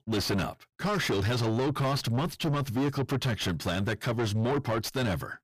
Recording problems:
distortion; heavy; 5 dB below the speech

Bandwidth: 15 kHz